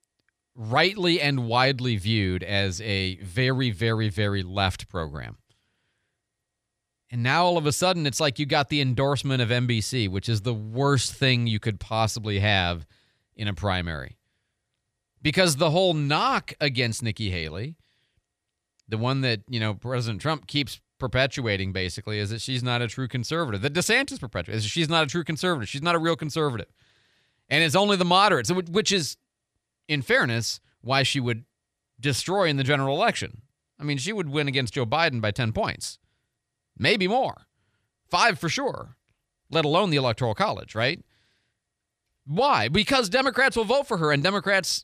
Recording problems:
none

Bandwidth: 14 kHz